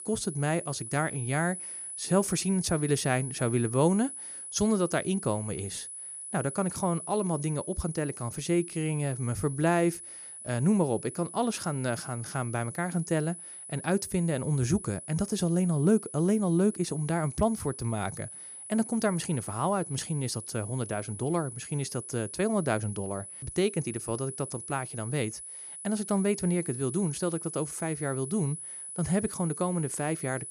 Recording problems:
high-pitched whine; loud; throughout; 10 kHz, 9 dB below the speech

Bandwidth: 15.5 kHz